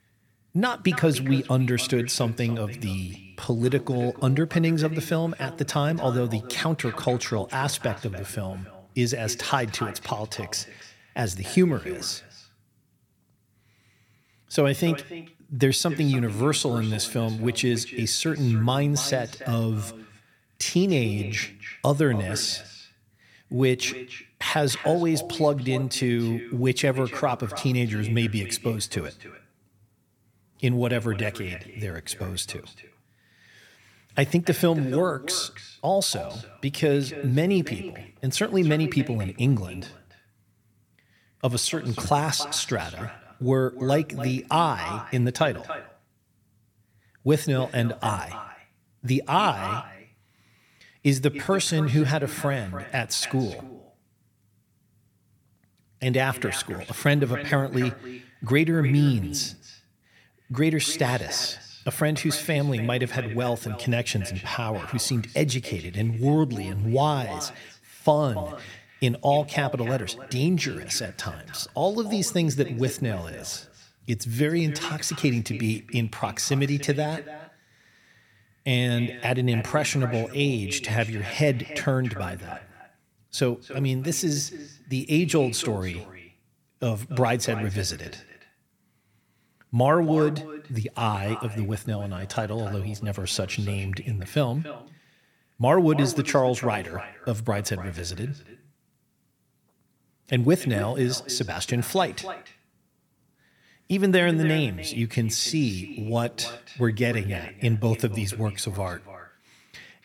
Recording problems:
echo of what is said; noticeable; throughout; 280 ms later, 15 dB below the speech

